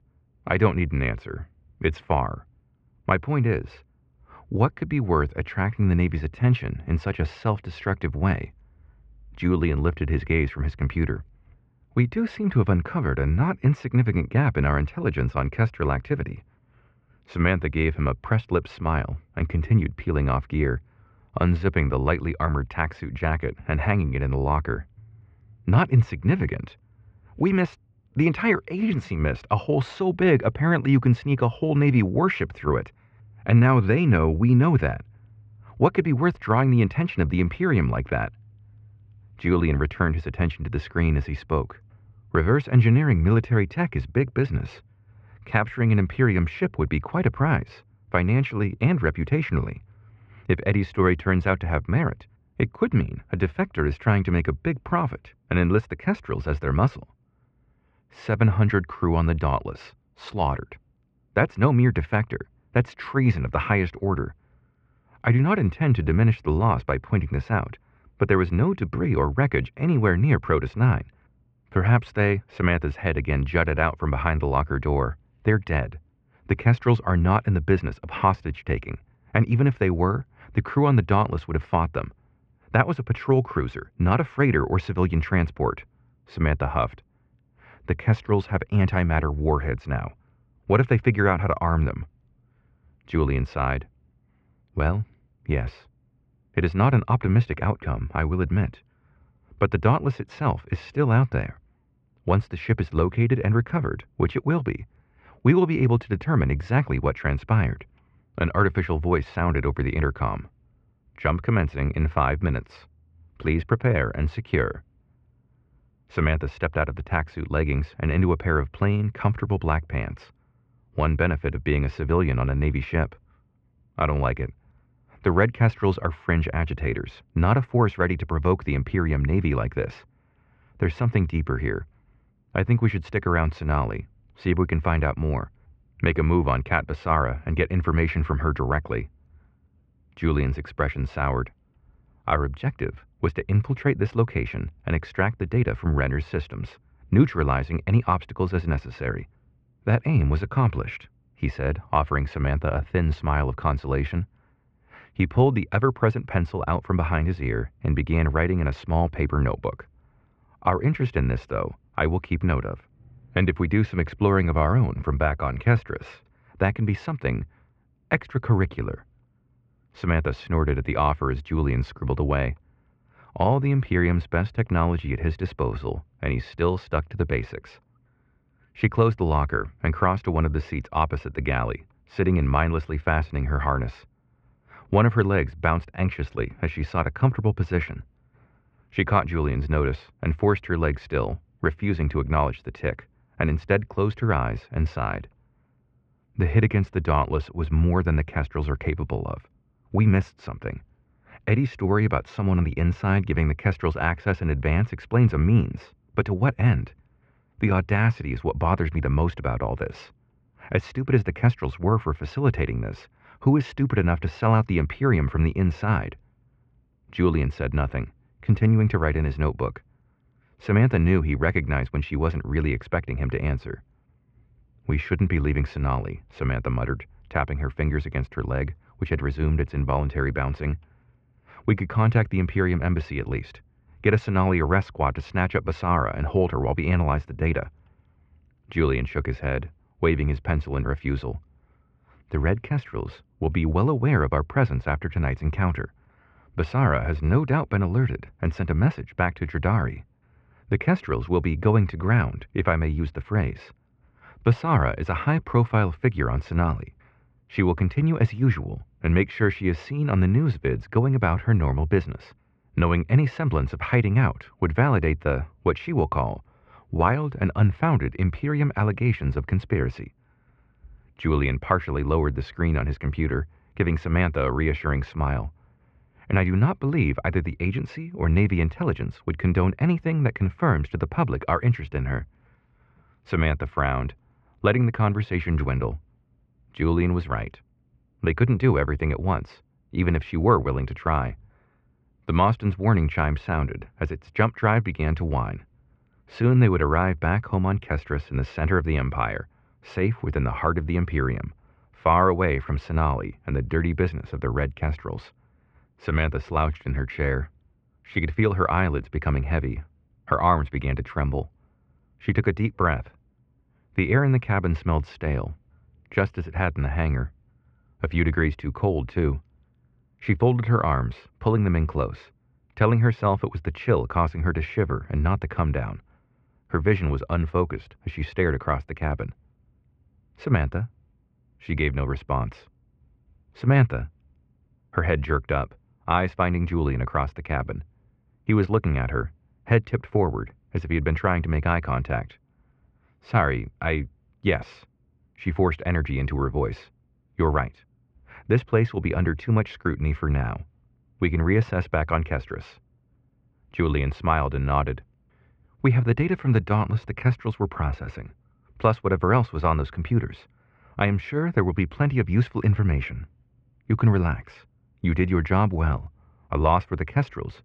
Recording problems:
muffled; very; fading above 2.5 kHz

